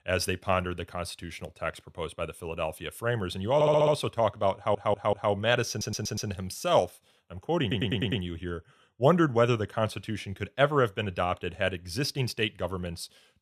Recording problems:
audio stuttering; 4 times, first at 3.5 s

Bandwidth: 14 kHz